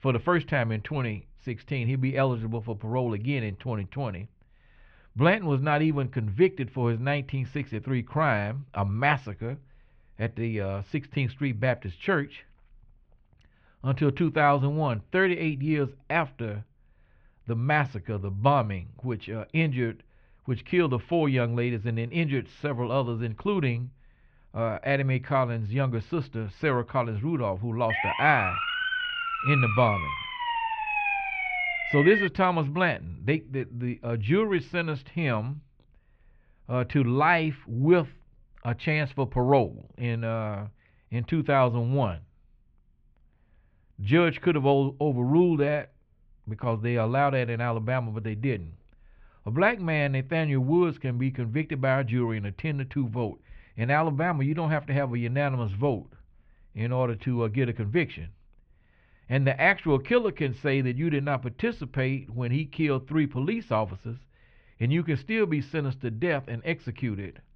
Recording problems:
muffled; very; fading above 3 kHz
siren; loud; from 28 to 32 s; peak 1 dB above the speech

